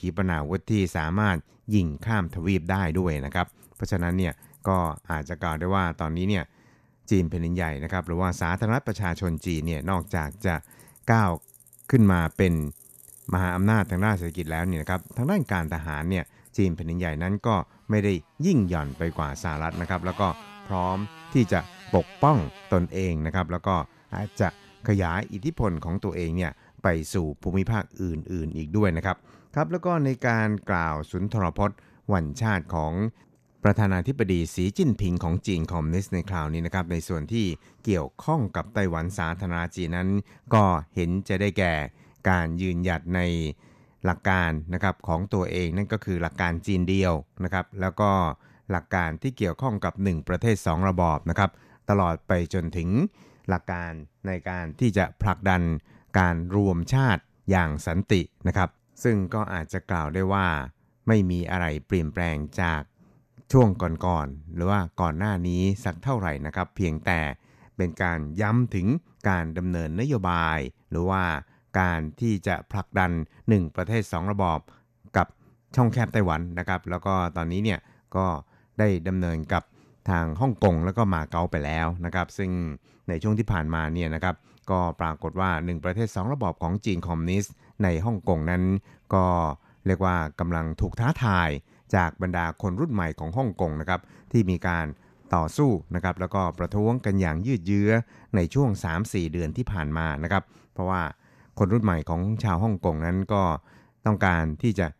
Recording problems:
traffic noise; faint; throughout; 25 dB below the speech

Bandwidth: 14.5 kHz